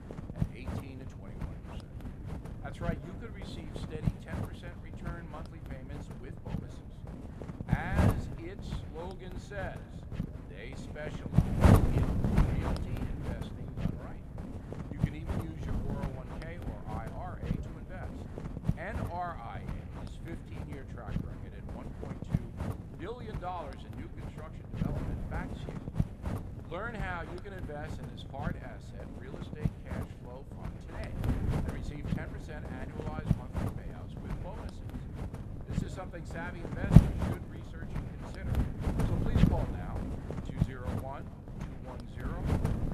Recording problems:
echo of what is said; faint; throughout; 200 ms later, 20 dB below the speech
wind noise on the microphone; heavy; 2 dB above the speech

